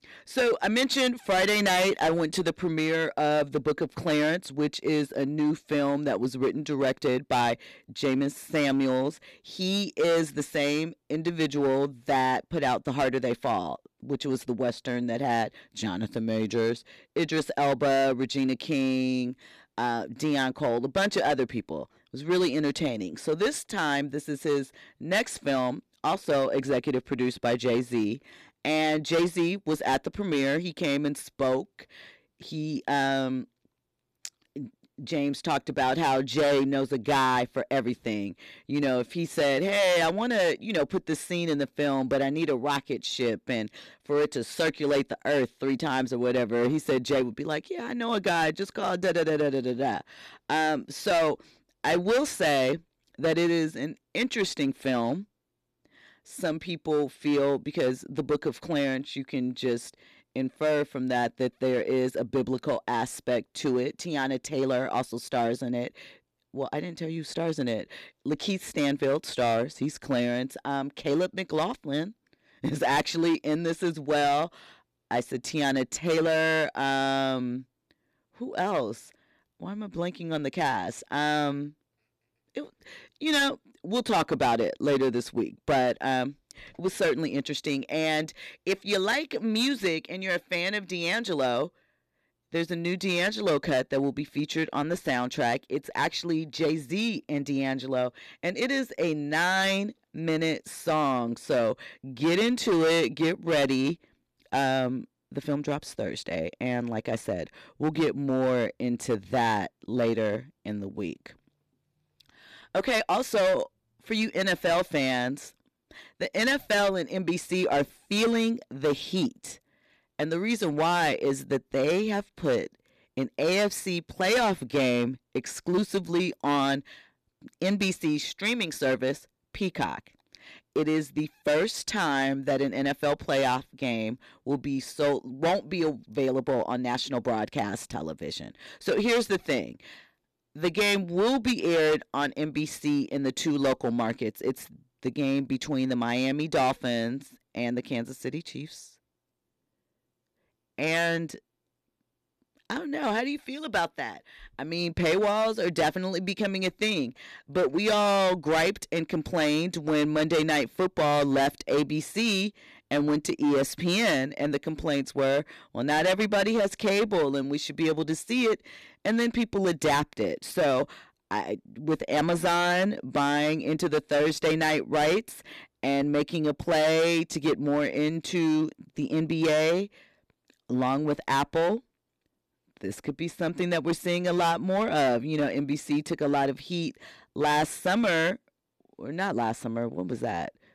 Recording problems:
distortion; heavy; 8% of the sound clipped

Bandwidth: 14 kHz